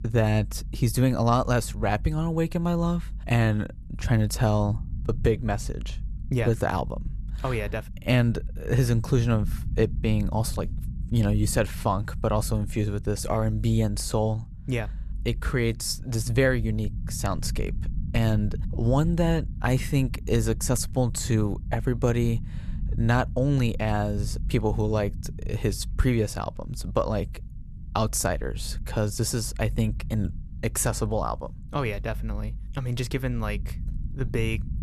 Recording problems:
low rumble; faint; throughout; 20 dB below the speech

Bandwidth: 13.5 kHz